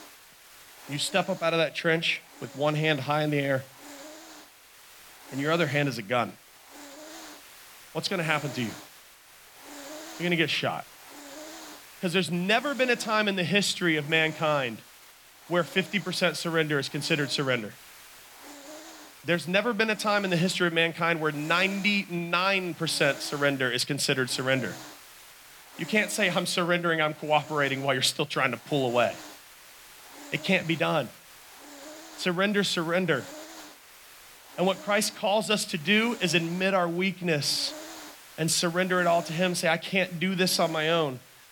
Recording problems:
hiss; noticeable; throughout; 20 dB below the speech

